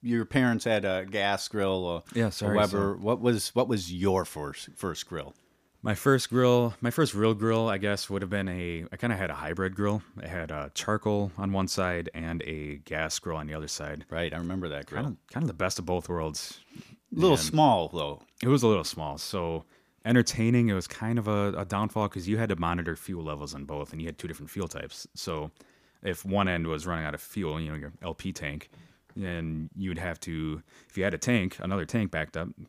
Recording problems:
none

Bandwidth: 15 kHz